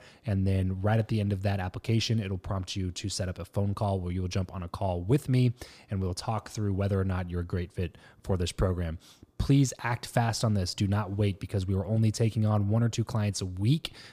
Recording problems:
none

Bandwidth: 15 kHz